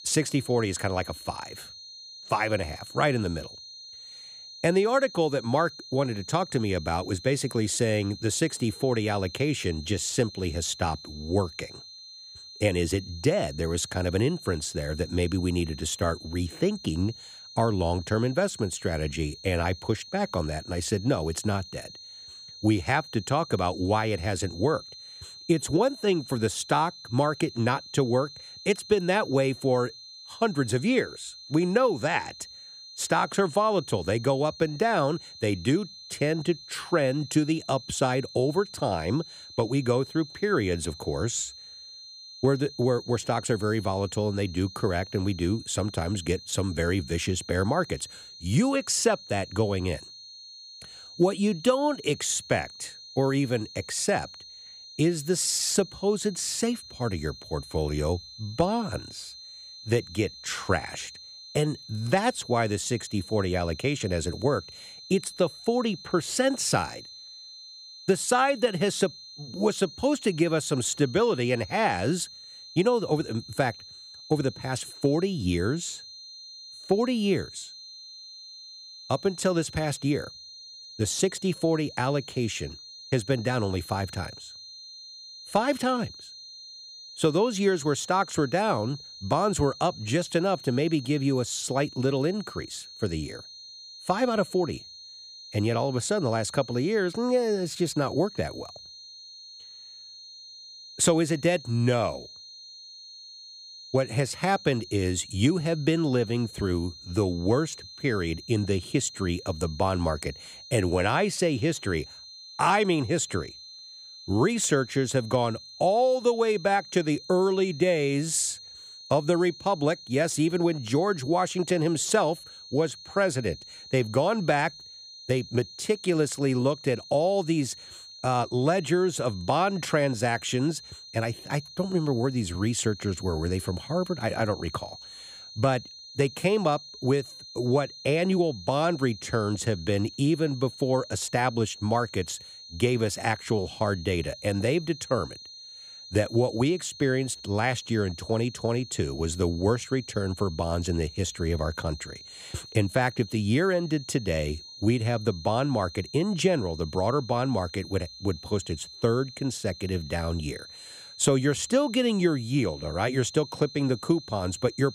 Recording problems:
high-pitched whine; noticeable; throughout; 4 kHz, 15 dB below the speech

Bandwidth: 15 kHz